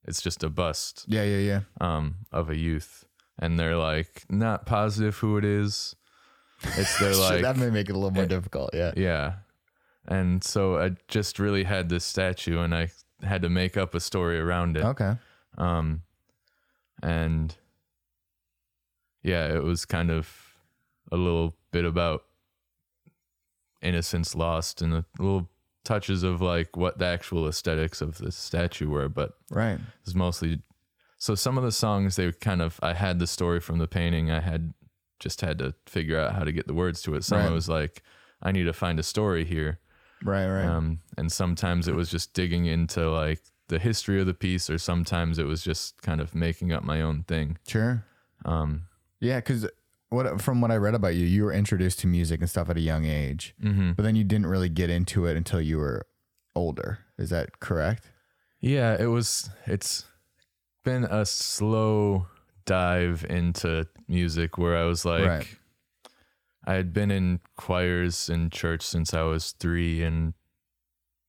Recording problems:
none

